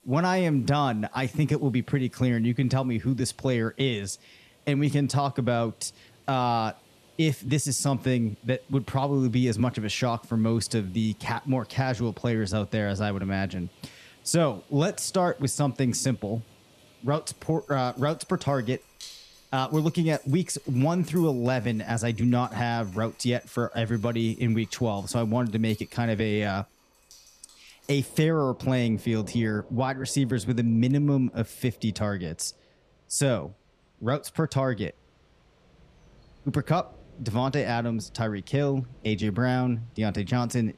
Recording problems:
rain or running water; faint; throughout; 25 dB below the speech

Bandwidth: 14.5 kHz